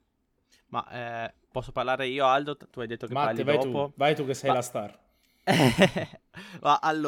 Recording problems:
abrupt cut into speech; at the end

